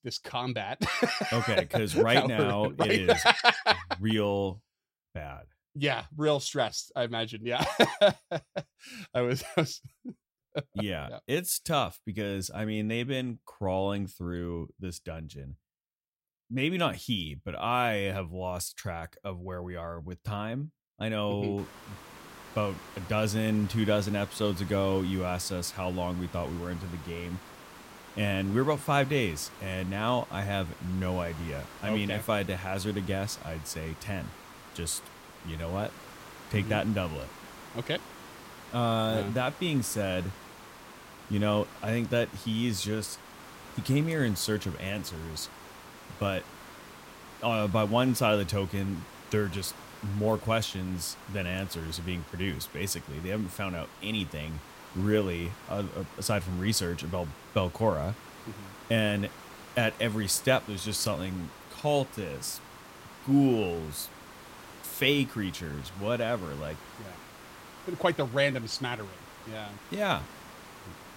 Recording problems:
hiss; noticeable; from 22 s on; 15 dB below the speech

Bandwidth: 16 kHz